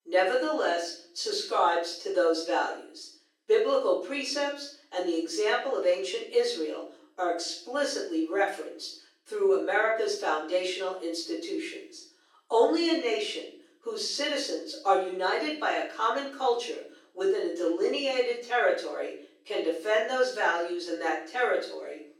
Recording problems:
off-mic speech; far
thin; very; fading below 350 Hz
room echo; noticeable; dies away in 0.5 s

